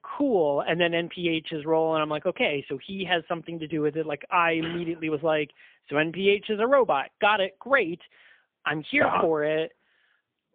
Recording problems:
phone-call audio; poor line; nothing above 3.5 kHz

